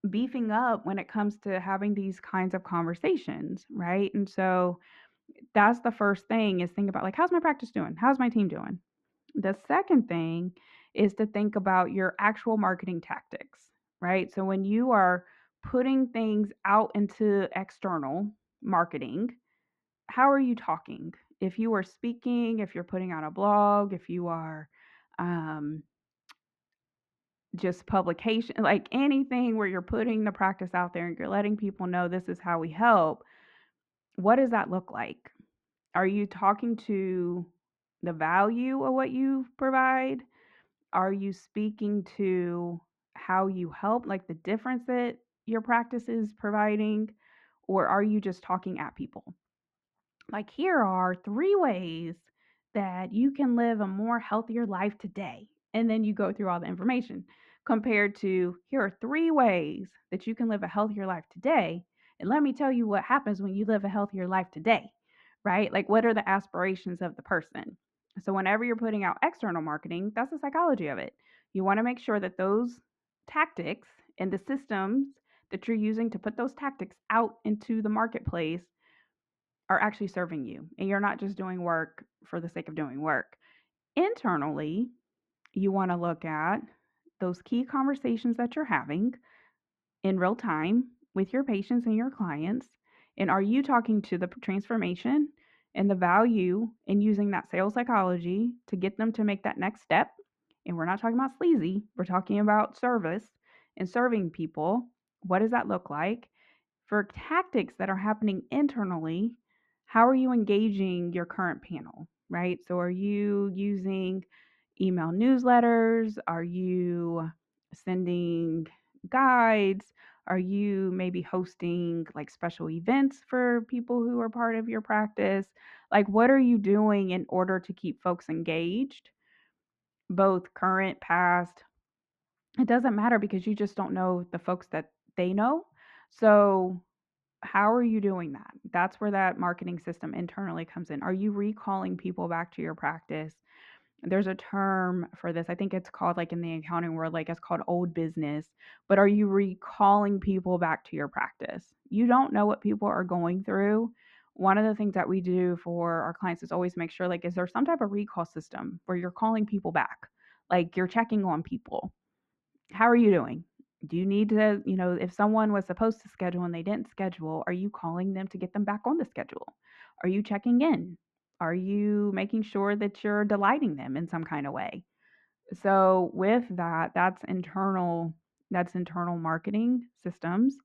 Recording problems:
muffled; very; fading above 1.5 kHz

